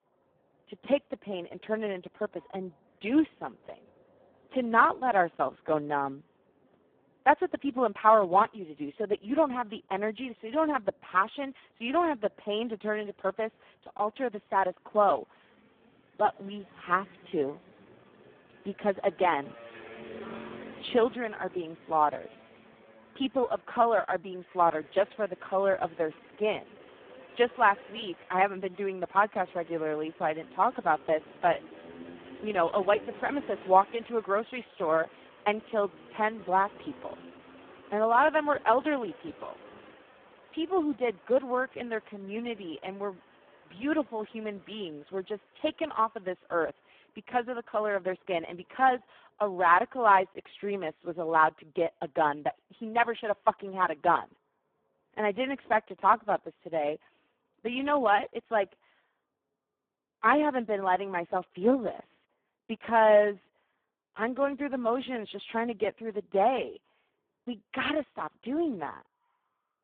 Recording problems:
phone-call audio; poor line
traffic noise; faint; throughout; 20 dB below the speech

